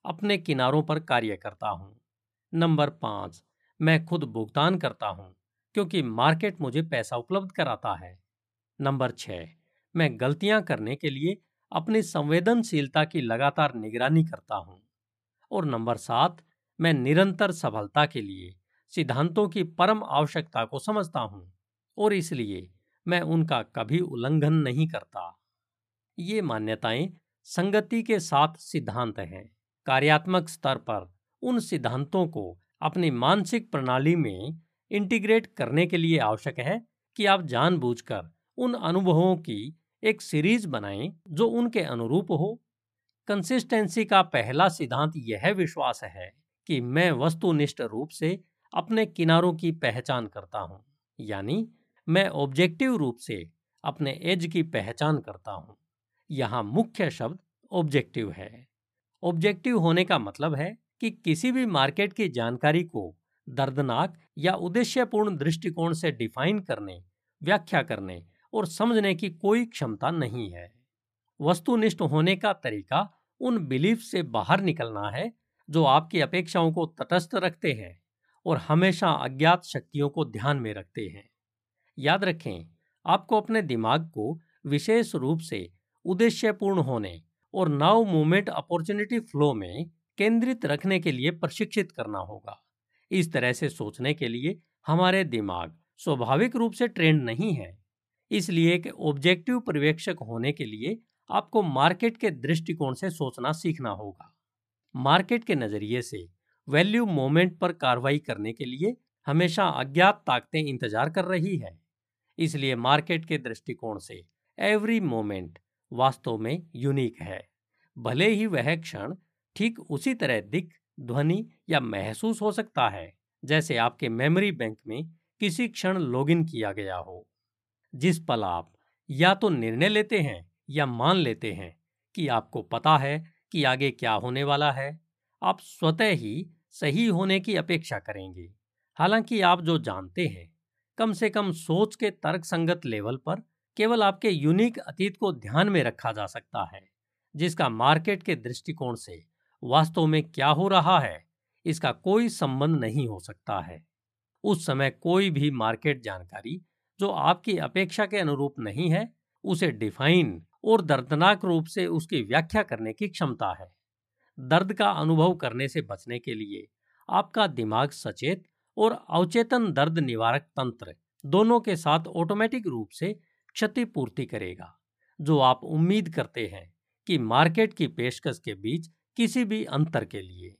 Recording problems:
none

